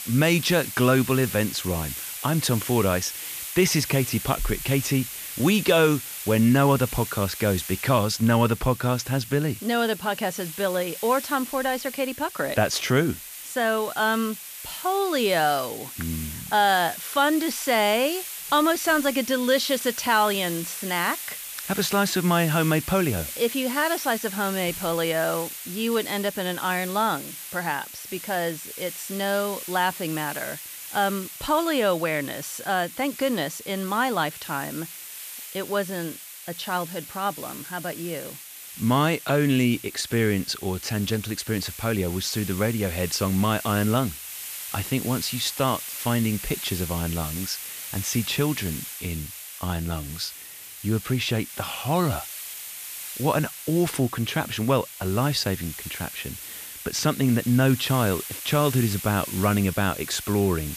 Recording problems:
hiss; loud; throughout; 9 dB below the speech

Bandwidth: 14.5 kHz